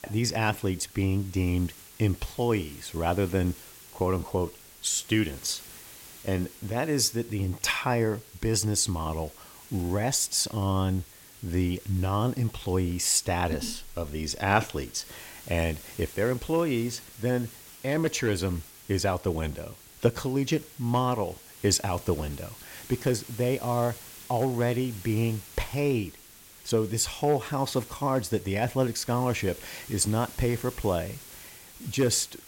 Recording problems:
hiss; noticeable; throughout; 20 dB below the speech

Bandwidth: 16.5 kHz